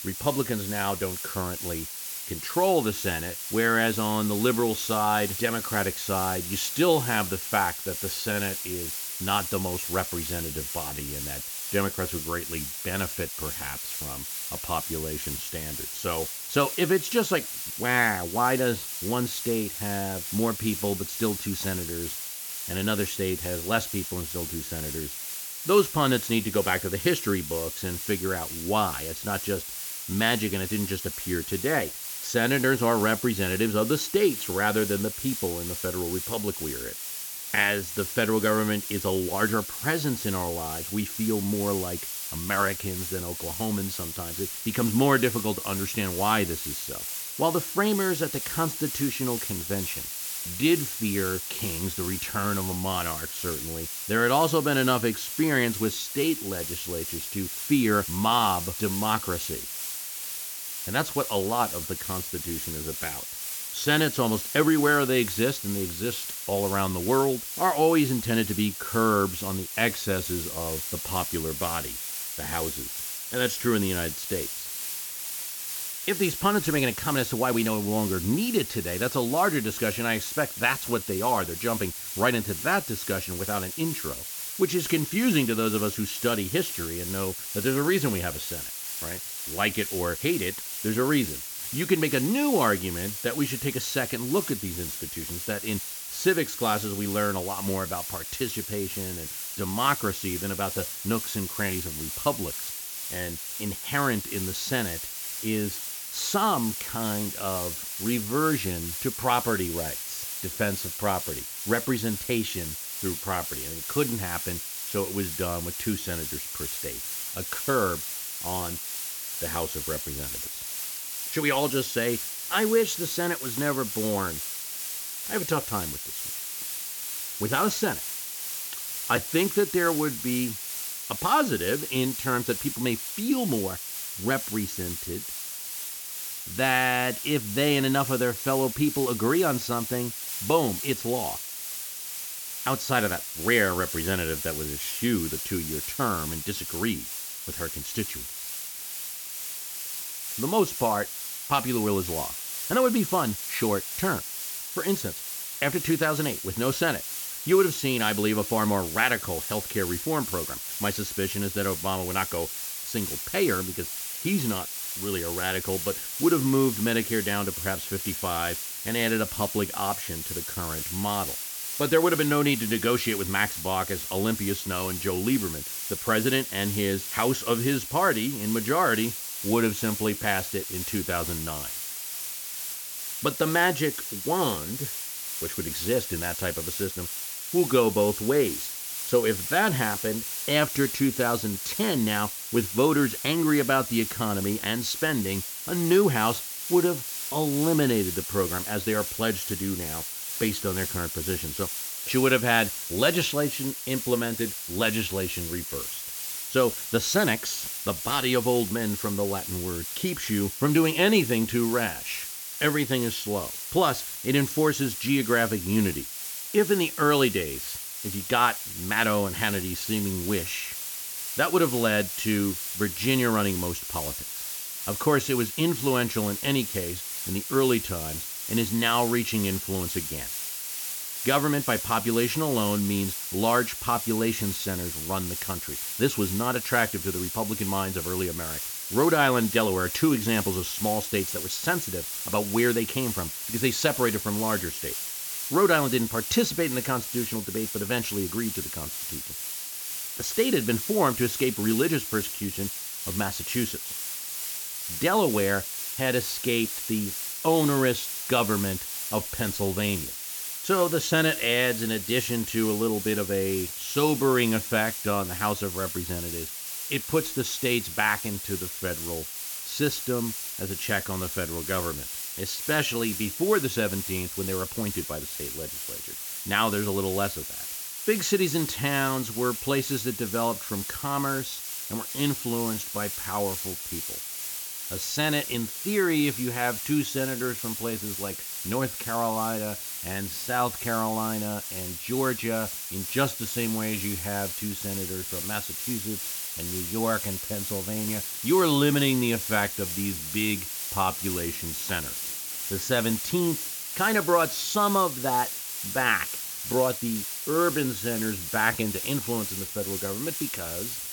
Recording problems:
high frequencies cut off; noticeable; nothing above 8 kHz
hiss; loud; throughout; 4 dB below the speech

